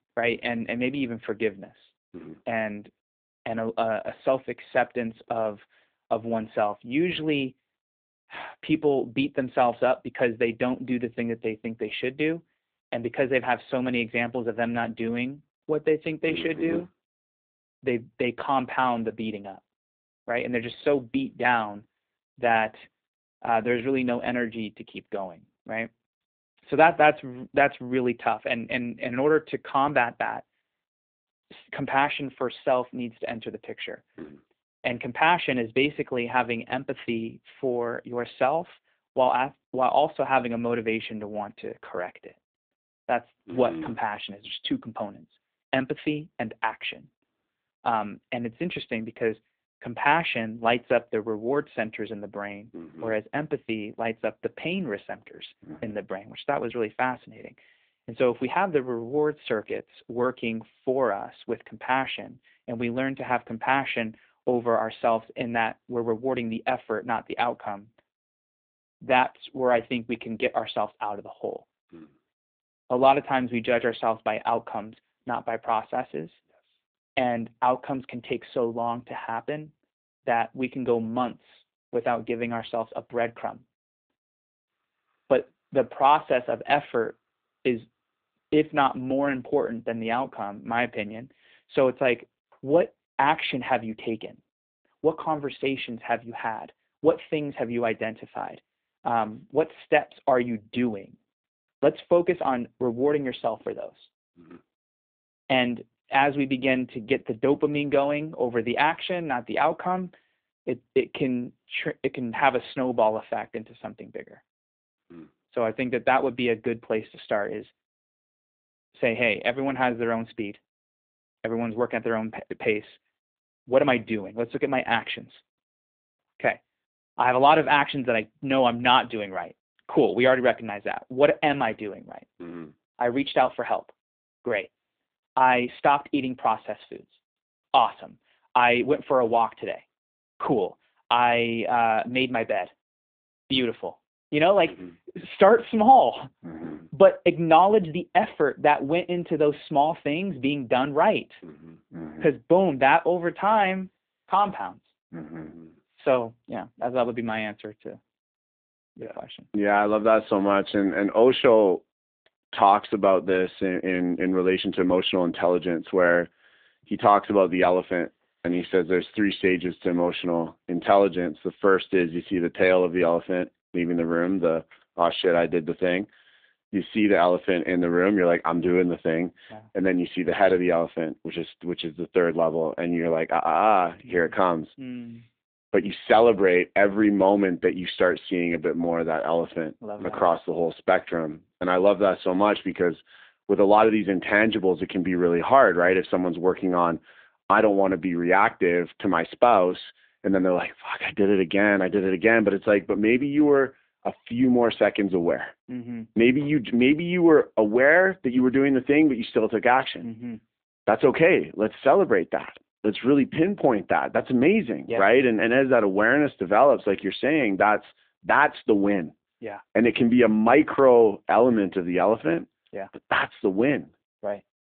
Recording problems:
phone-call audio; nothing above 3.5 kHz

